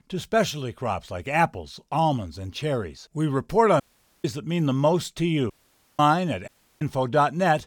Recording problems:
audio cutting out; at 4 s, at 5.5 s and at 6.5 s

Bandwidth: 19 kHz